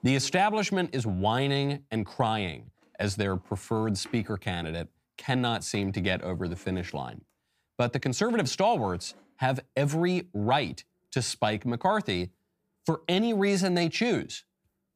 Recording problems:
household noises; faint; throughout; 30 dB below the speech

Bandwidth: 15 kHz